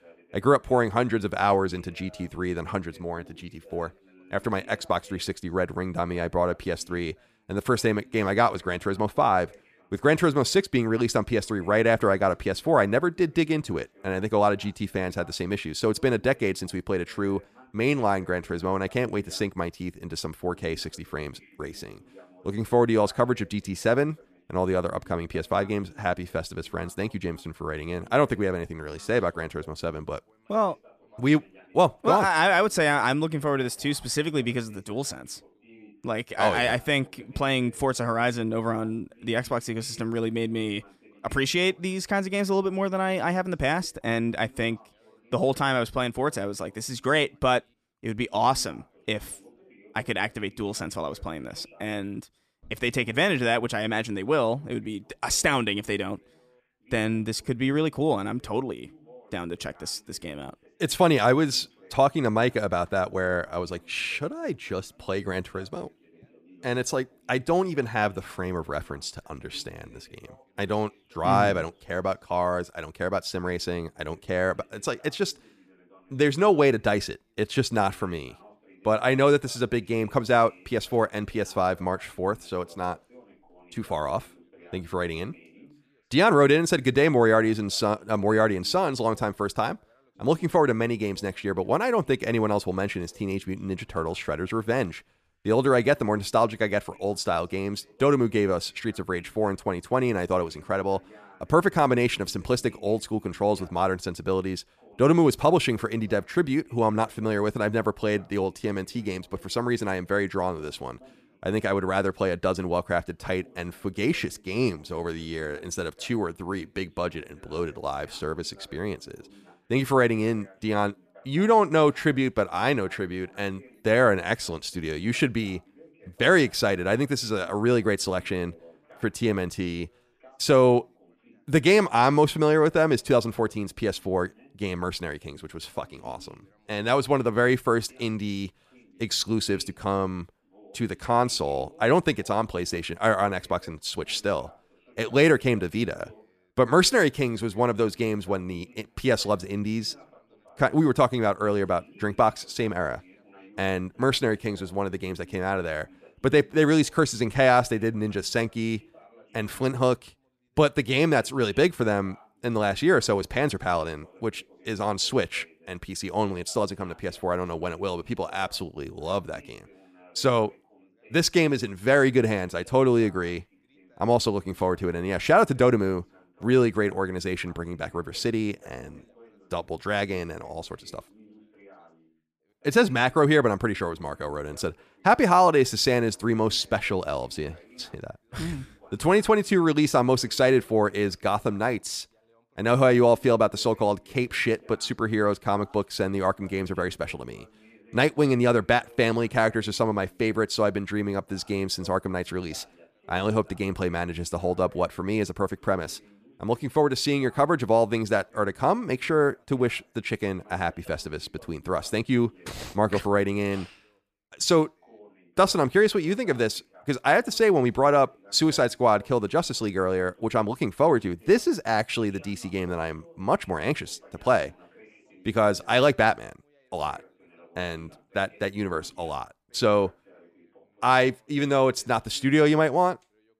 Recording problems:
background chatter; faint; throughout; 2 voices, 30 dB below the speech

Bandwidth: 14.5 kHz